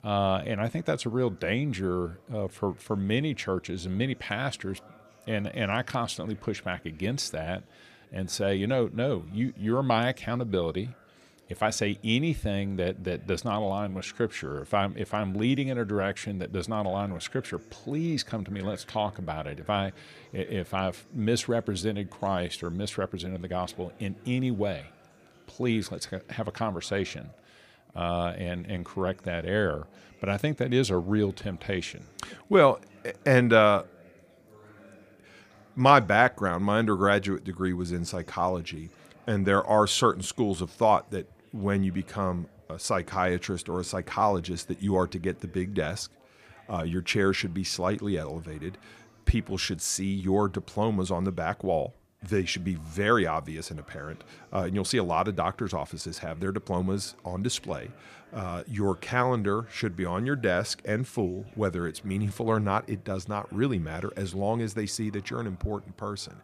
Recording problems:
chatter from many people; faint; throughout; 30 dB below the speech

